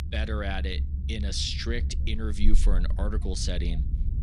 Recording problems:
low rumble; noticeable; throughout; 15 dB below the speech

